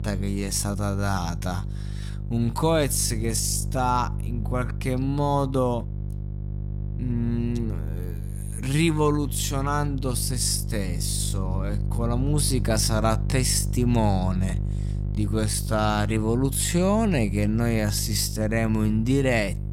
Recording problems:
wrong speed, natural pitch; too slow; 0.6 times normal speed
electrical hum; noticeable; throughout; 50 Hz, 15 dB below the speech

